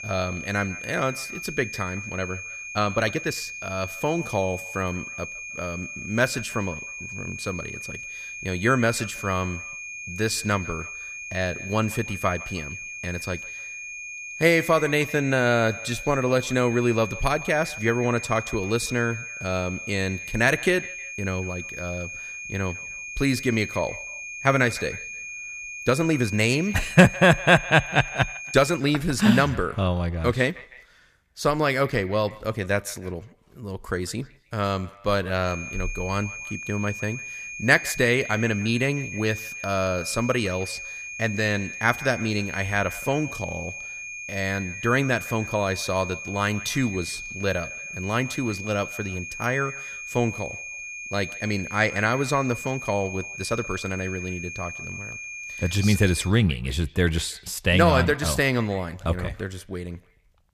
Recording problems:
echo of what is said; faint; throughout; 160 ms later, 20 dB below the speech
high-pitched whine; loud; until 29 s and from 35 to 56 s; 2.5 kHz, 9 dB below the speech
uneven, jittery; strongly; from 2.5 to 54 s

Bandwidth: 15 kHz